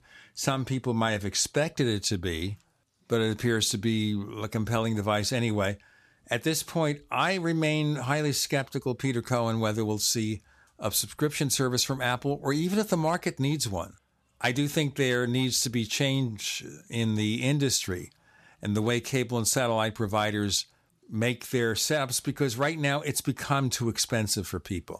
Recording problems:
none

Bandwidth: 14.5 kHz